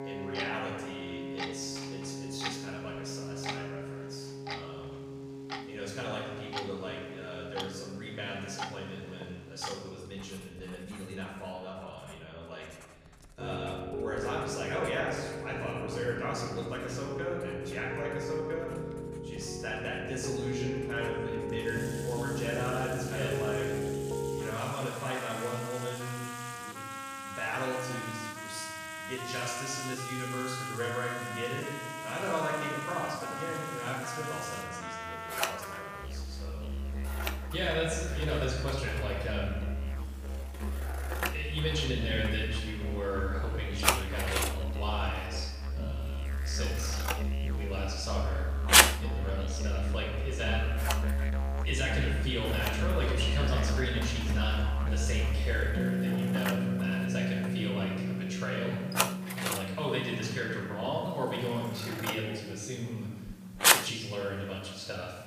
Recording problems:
off-mic speech; far
room echo; noticeable; dies away in 1.3 s
household noises; very loud; throughout; 4 dB above the speech
background music; loud; throughout; as loud as the speech

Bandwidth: 15 kHz